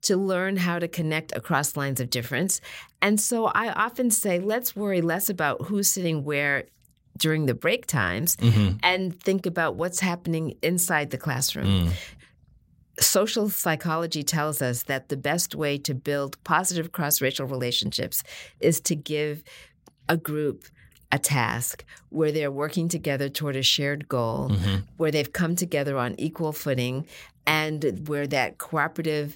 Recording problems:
none

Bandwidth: 16 kHz